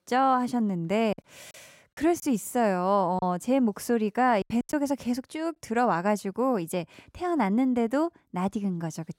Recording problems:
choppy; very; from 1 to 3 s and at 4.5 s; 7% of the speech affected

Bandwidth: 16 kHz